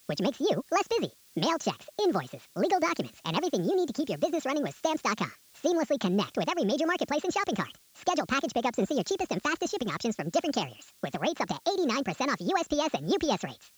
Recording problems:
wrong speed and pitch; too fast and too high; 1.6 times normal speed
high frequencies cut off; noticeable; nothing above 8 kHz
hiss; faint; throughout; 25 dB below the speech

